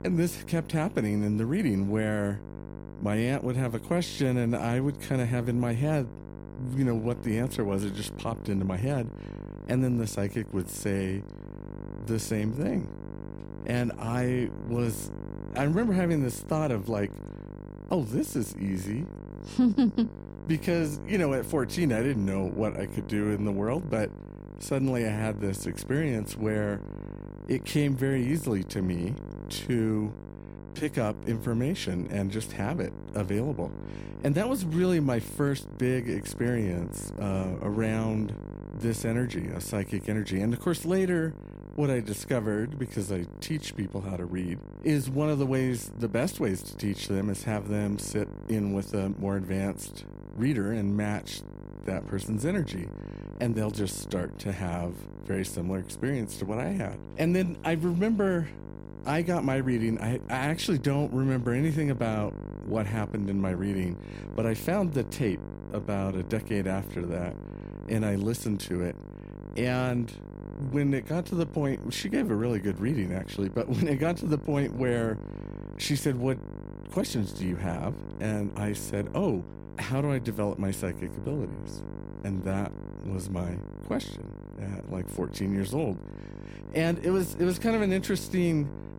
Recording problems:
electrical hum; noticeable; throughout; 50 Hz, 15 dB below the speech

